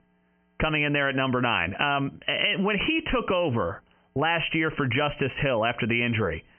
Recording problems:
high frequencies cut off; severe; nothing above 3 kHz
squashed, flat; heavily

